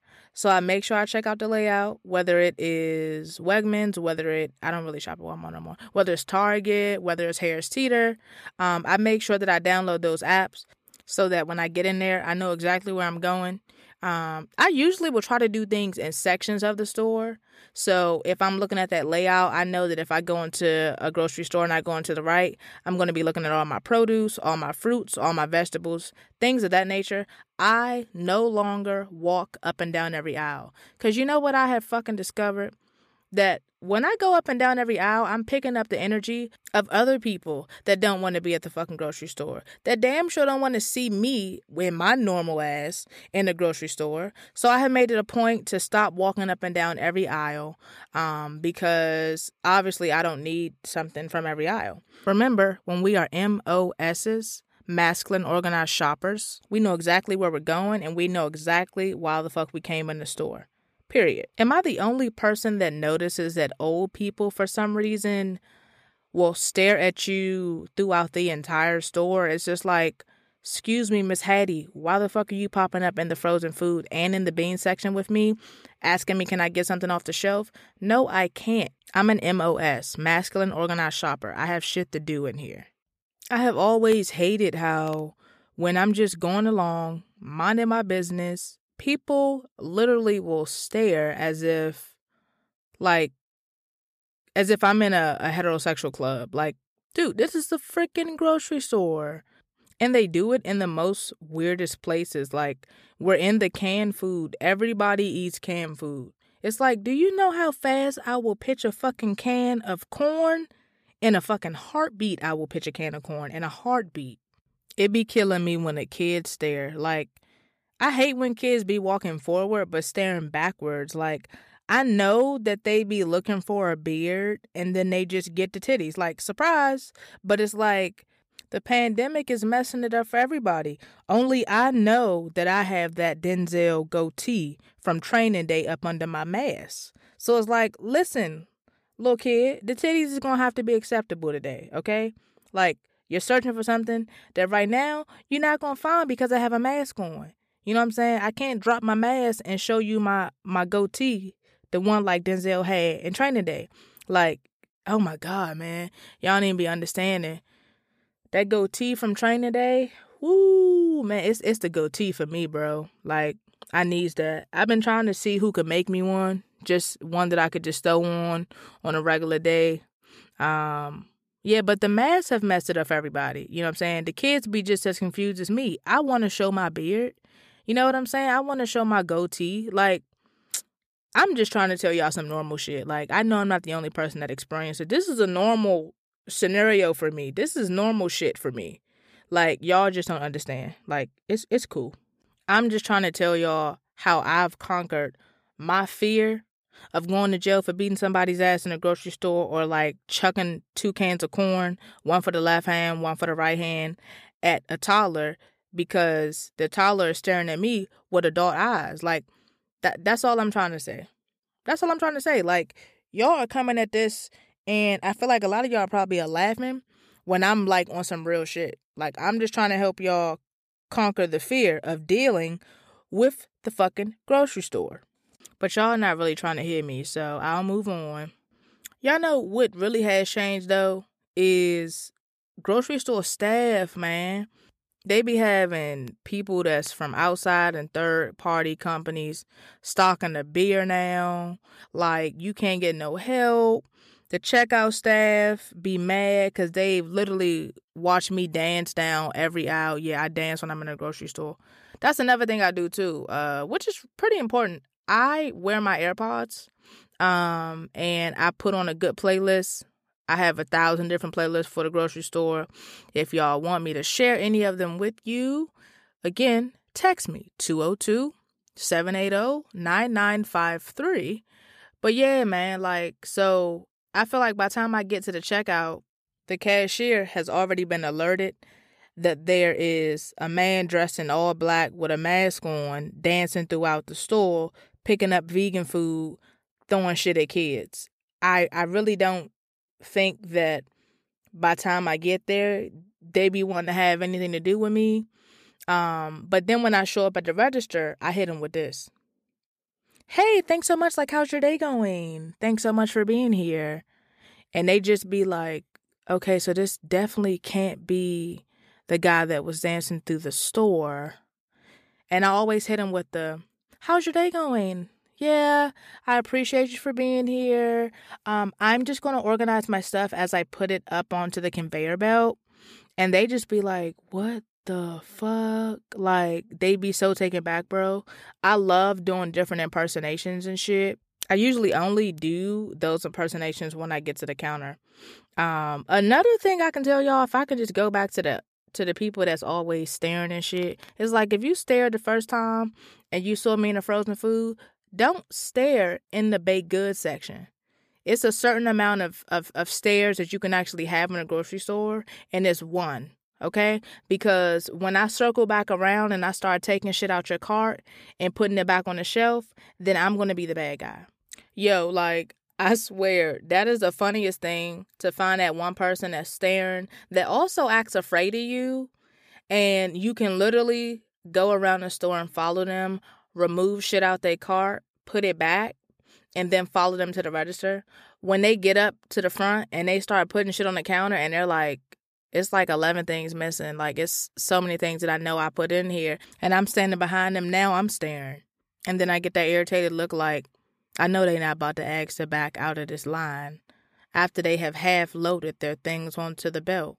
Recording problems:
none

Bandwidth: 14.5 kHz